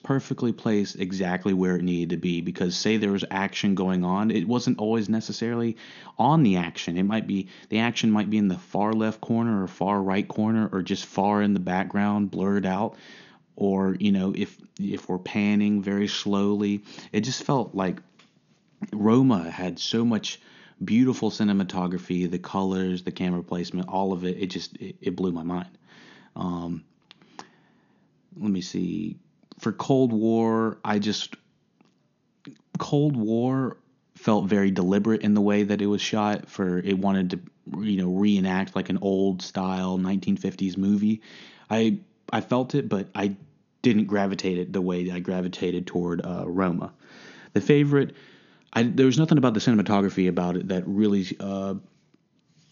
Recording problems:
high frequencies cut off; noticeable; nothing above 7 kHz

